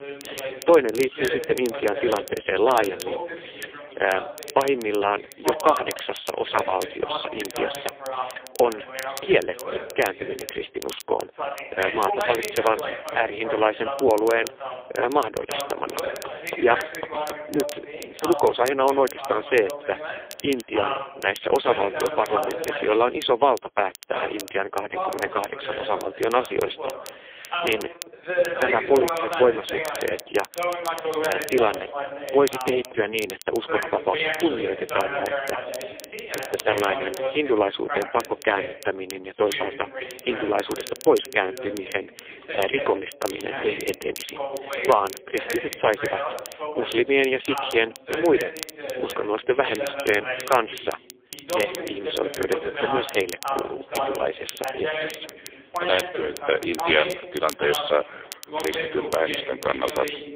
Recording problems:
phone-call audio; poor line
thin; very; fading below 350 Hz
voice in the background; loud; throughout; 6 dB below the speech
crackle, like an old record; noticeable; 15 dB below the speech
household noises; faint; throughout; 25 dB below the speech

